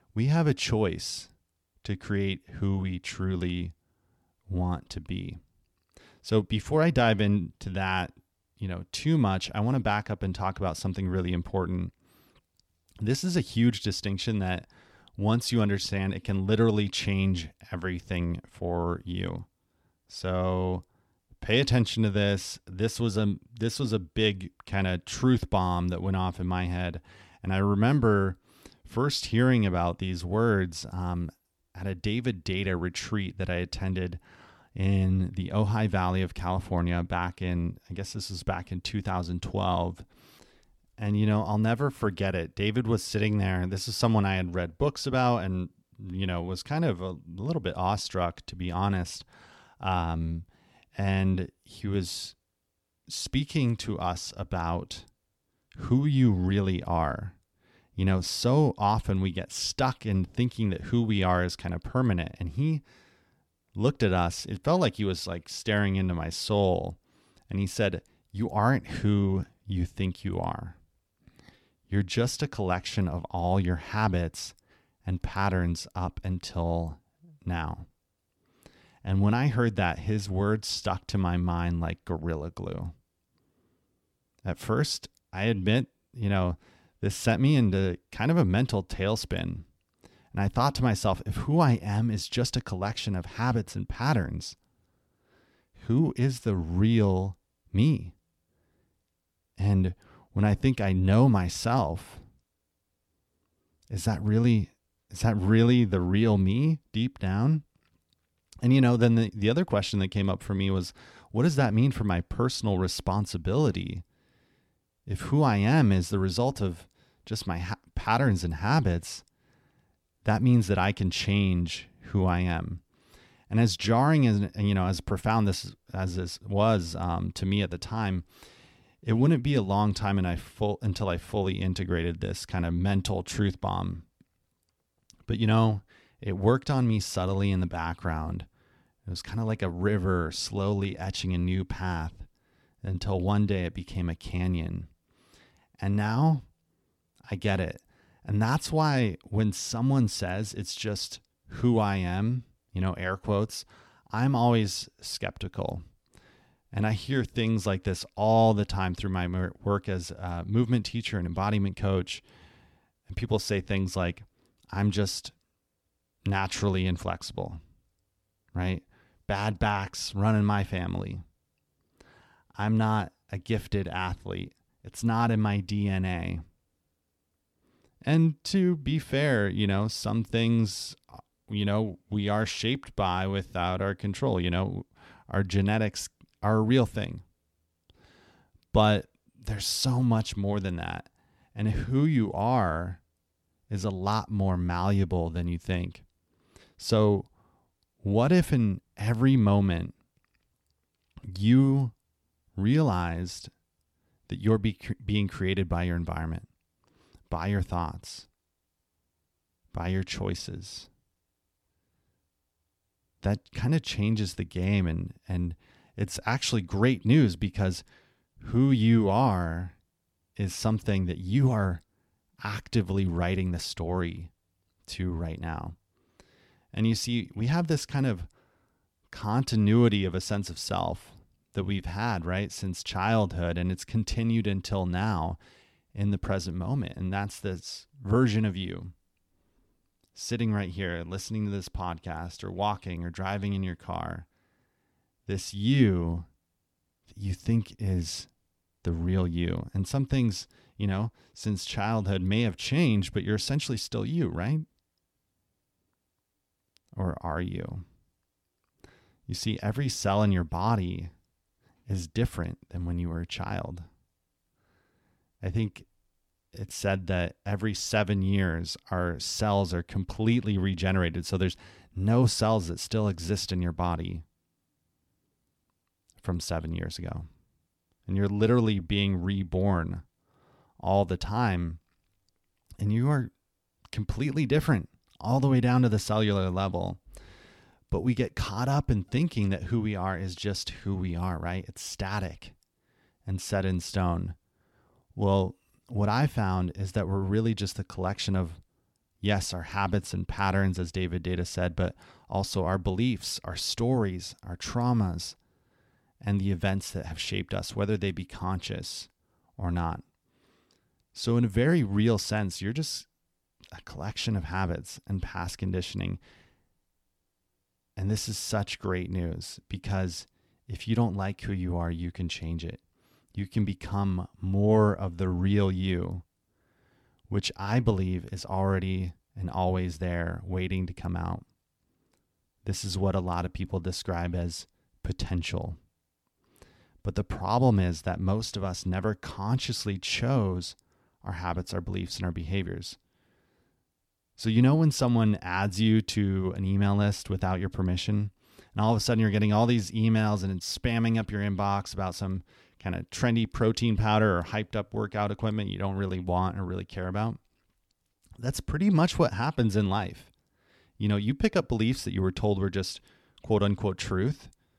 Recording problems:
none

